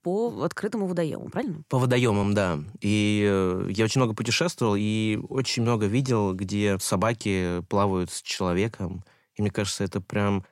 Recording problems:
uneven, jittery; strongly; from 0.5 to 9.5 s

